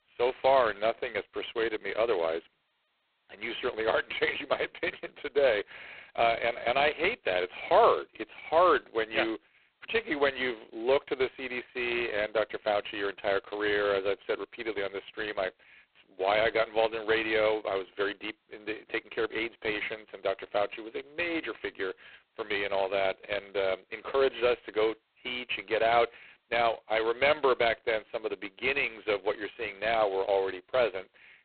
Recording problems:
phone-call audio; poor line; nothing above 4 kHz

